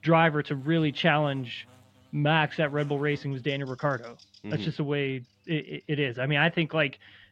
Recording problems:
muffled; slightly; fading above 3.5 kHz
electrical hum; faint; throughout; 50 Hz, 30 dB below the speech

